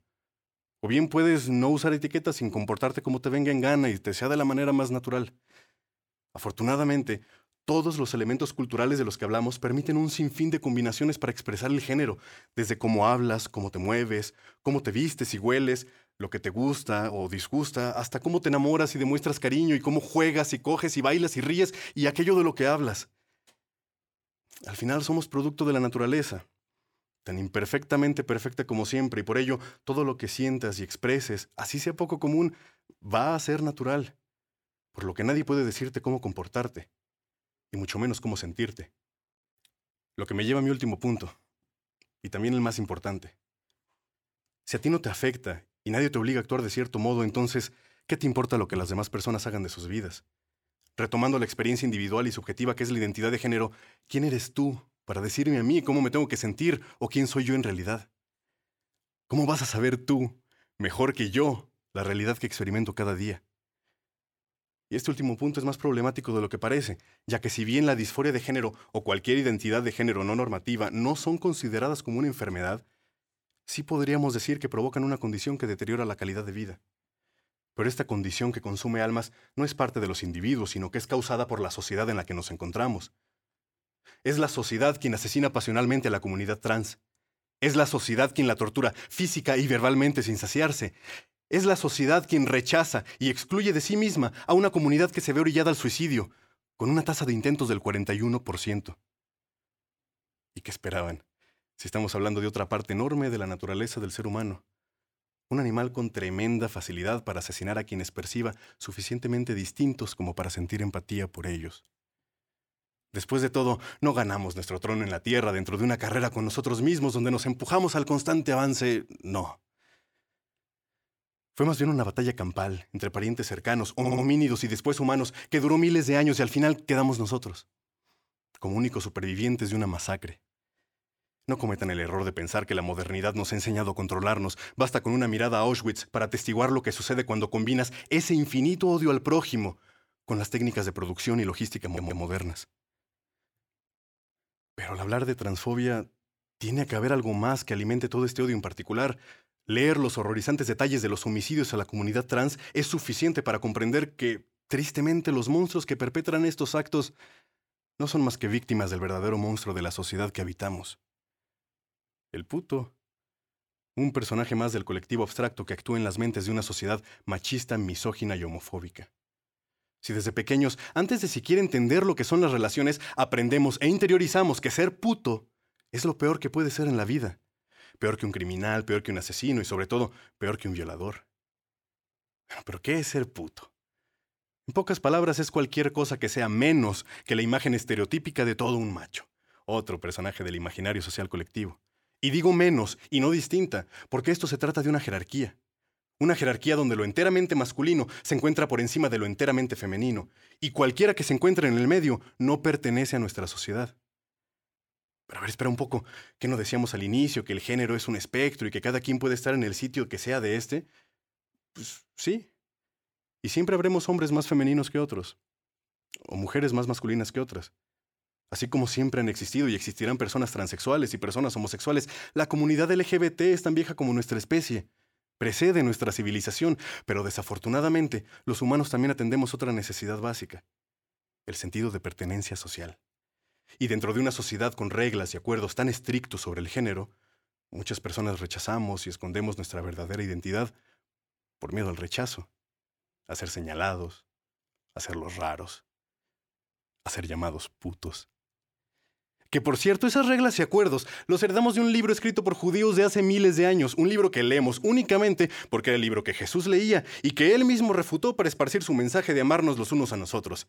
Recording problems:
audio stuttering; at 2:04 and at 2:22

